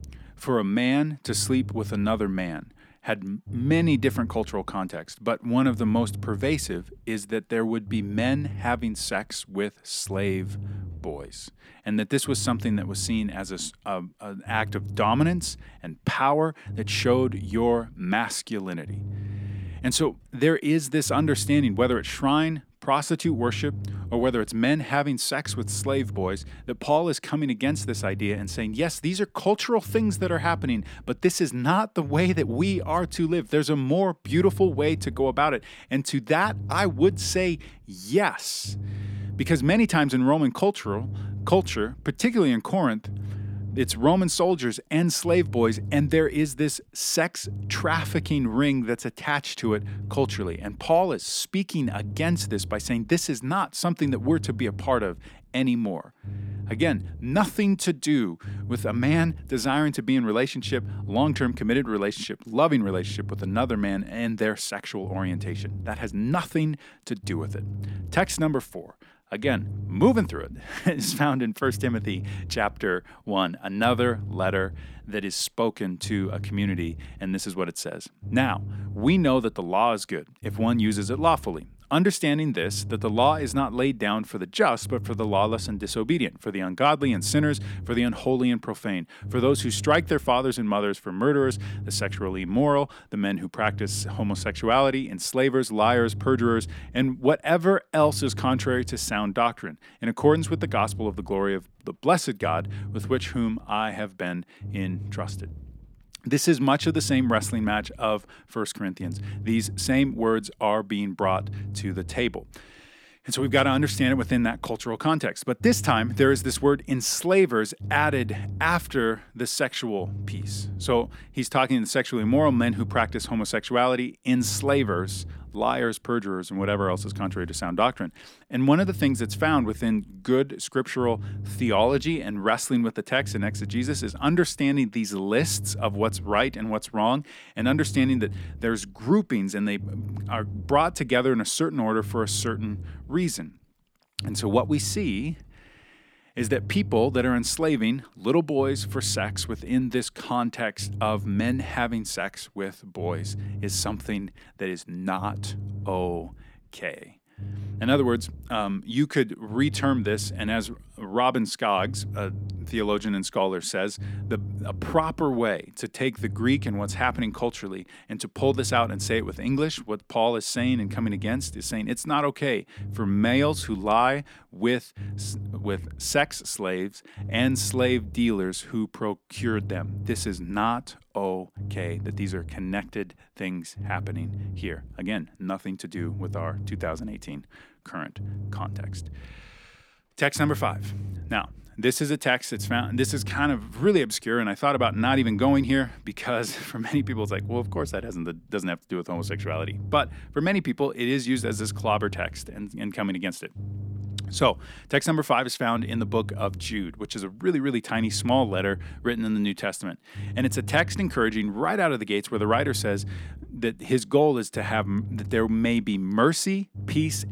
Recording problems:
low rumble; faint; throughout; 20 dB below the speech

